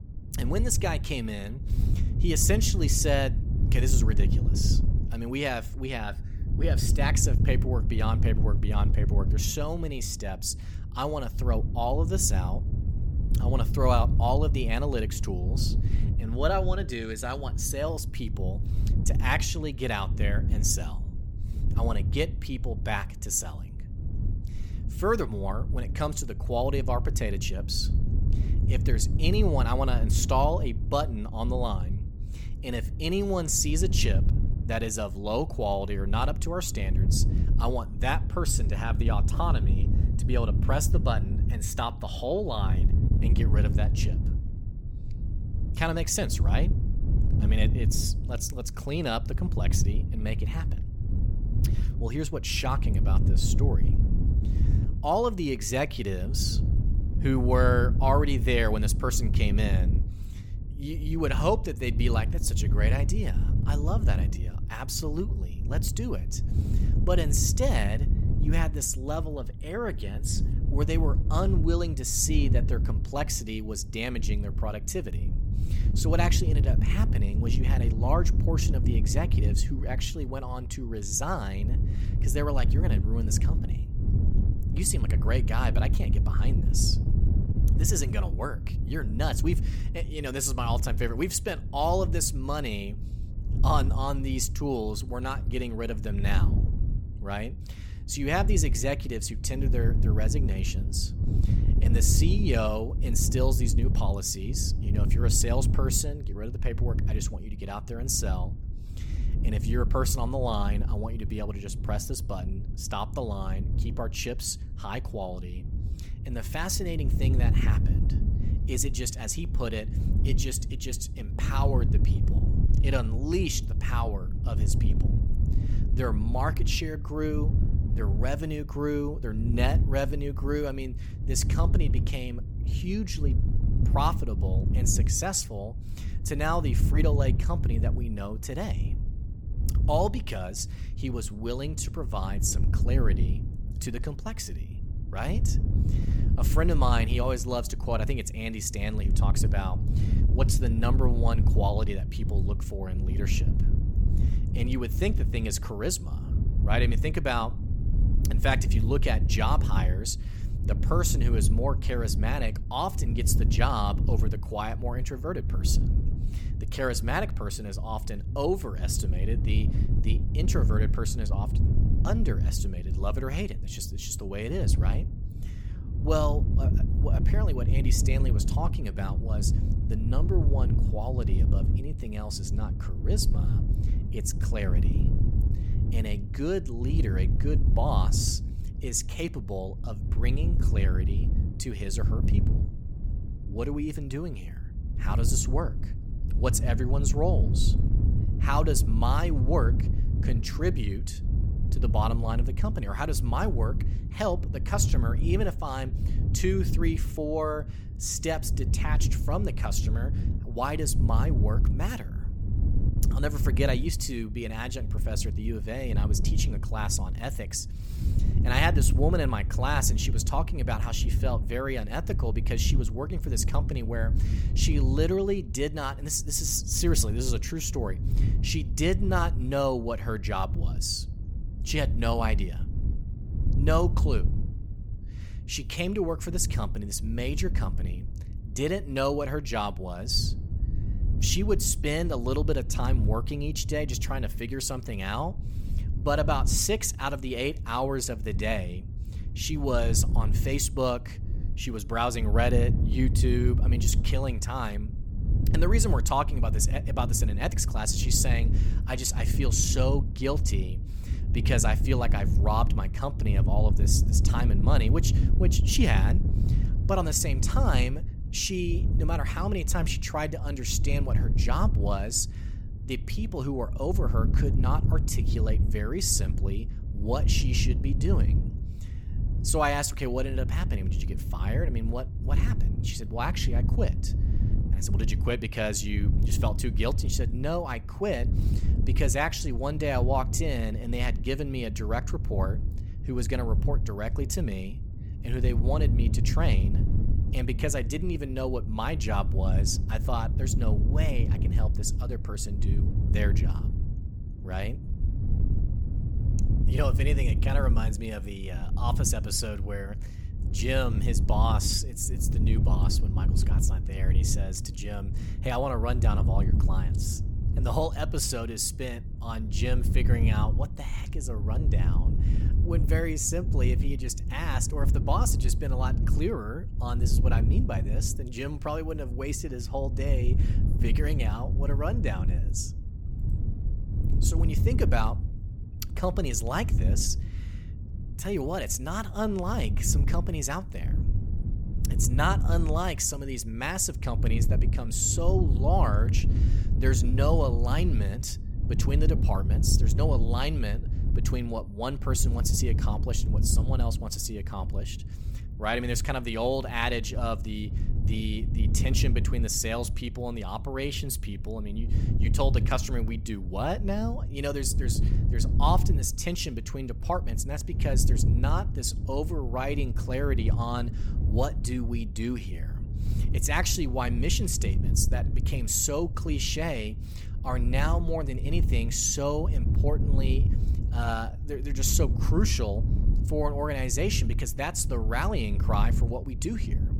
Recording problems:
wind noise on the microphone; occasional gusts; 10 dB below the speech

